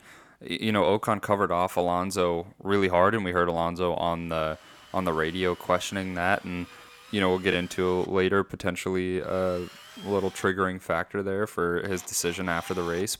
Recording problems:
machinery noise; faint; from 4.5 s on; 20 dB below the speech

